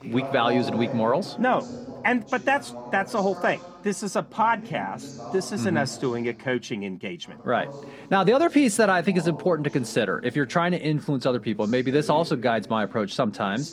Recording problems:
voice in the background; noticeable; throughout; 15 dB below the speech

